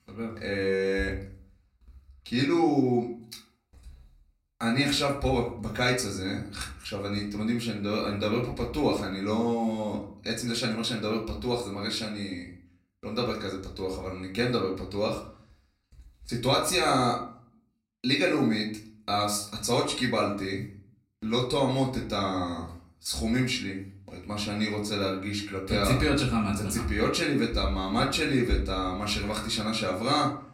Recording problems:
off-mic speech; far
room echo; slight; dies away in 0.4 s

